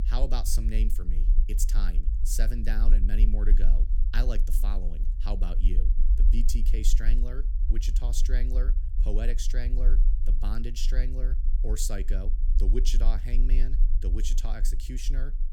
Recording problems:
low rumble; noticeable; throughout; 10 dB below the speech

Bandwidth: 18 kHz